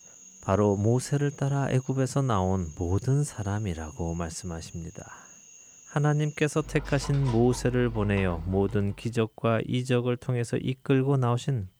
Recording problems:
animal sounds; noticeable; until 8.5 s; 20 dB below the speech

